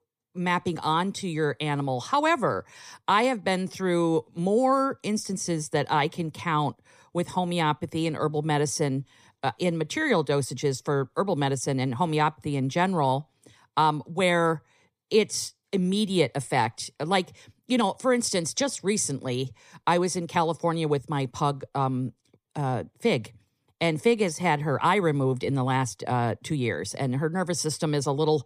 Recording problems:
none

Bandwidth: 15 kHz